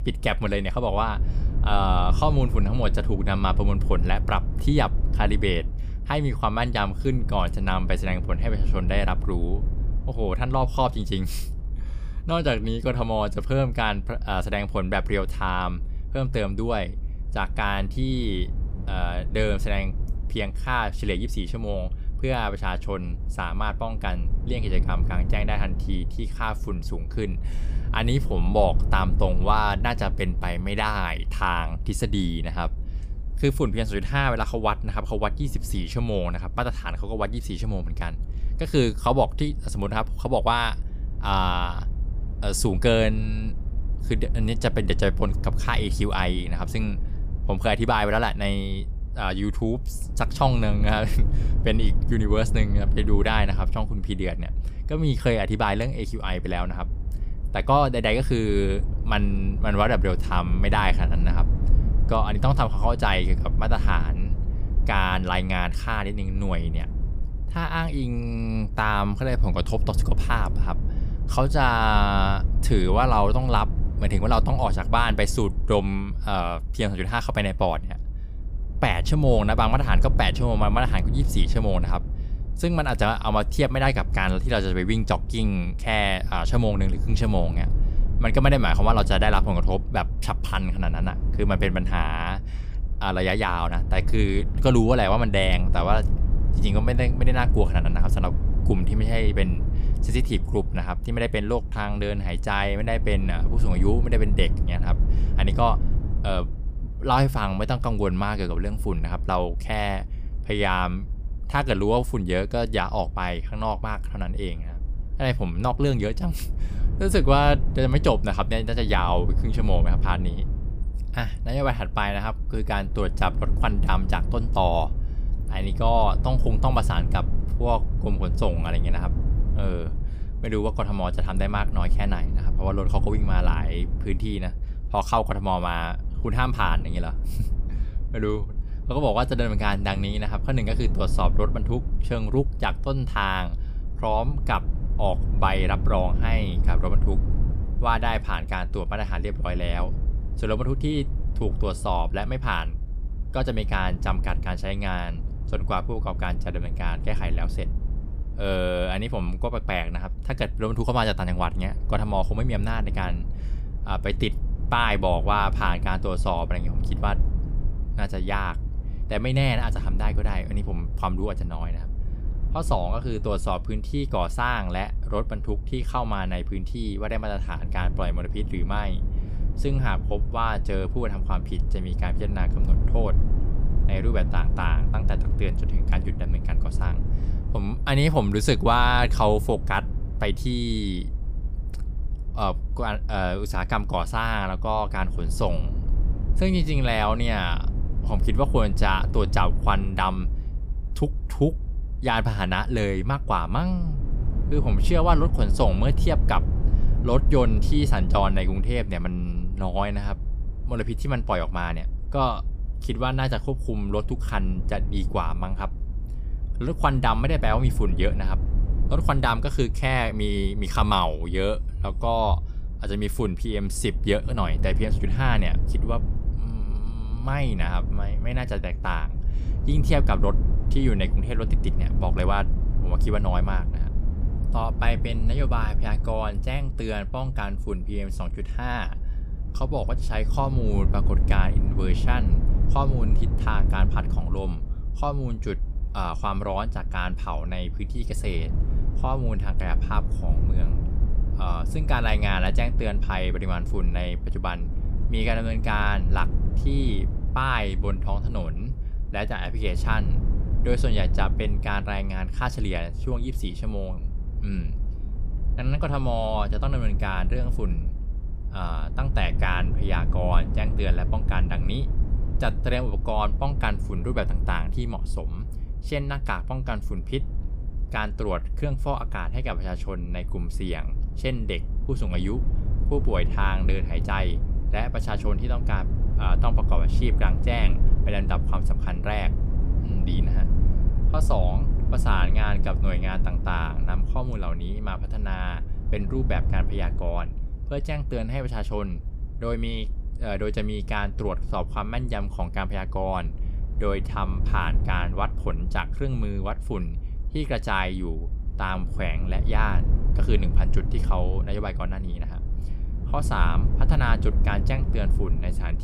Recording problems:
low rumble; noticeable; throughout; 15 dB below the speech

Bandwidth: 15 kHz